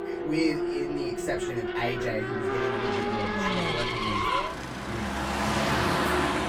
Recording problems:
off-mic speech; far
room echo; very slight; dies away in 0.2 s
traffic noise; very loud; throughout; 5 dB above the speech

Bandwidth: 18.5 kHz